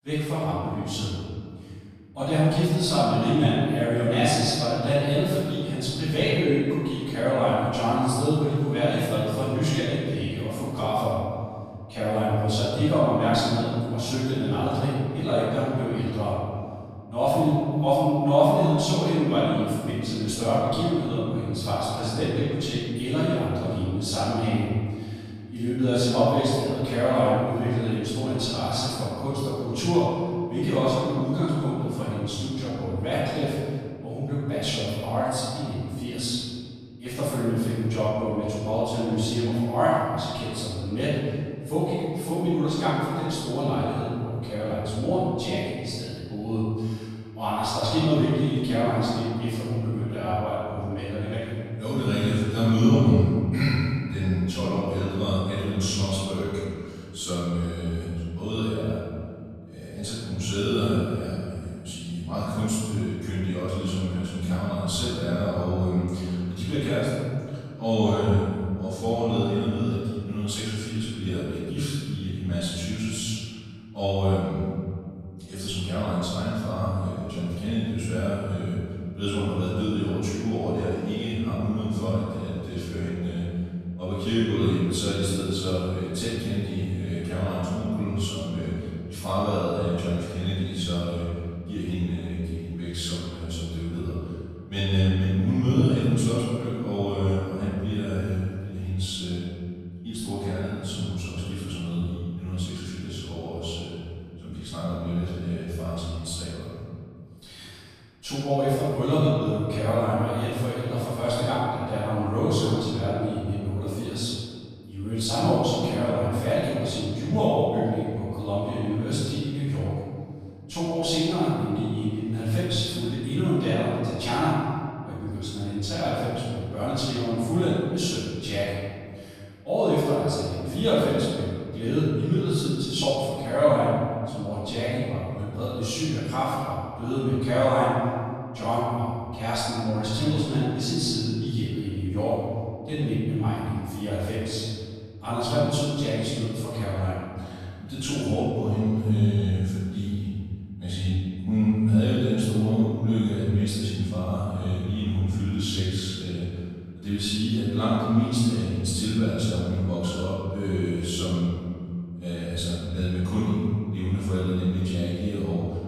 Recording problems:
room echo; strong; dies away in 2.1 s
off-mic speech; far

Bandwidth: 15 kHz